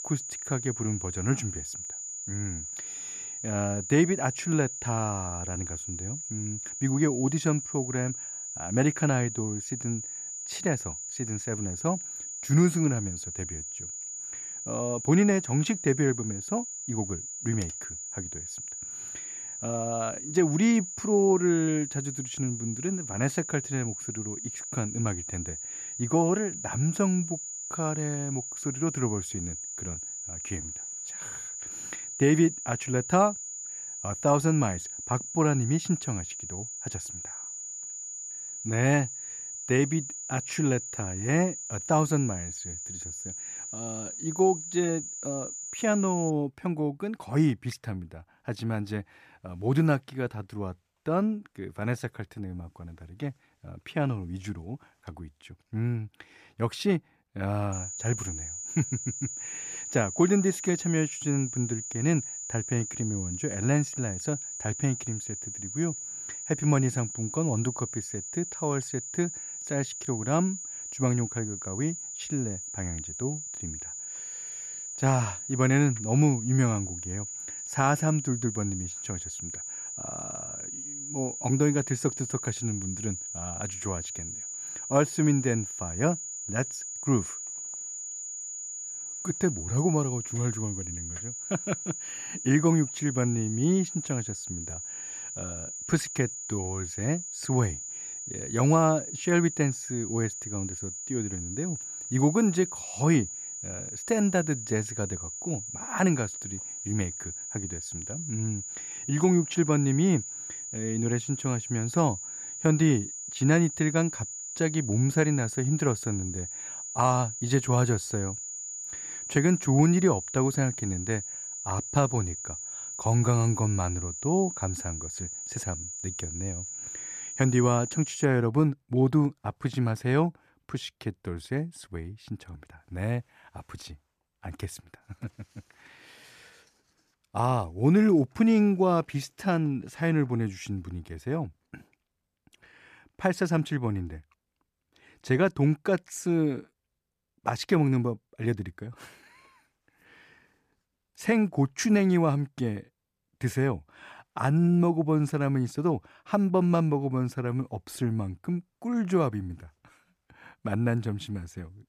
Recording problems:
high-pitched whine; loud; until 46 s and from 58 s to 2:08; 7 kHz, 7 dB below the speech

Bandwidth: 14.5 kHz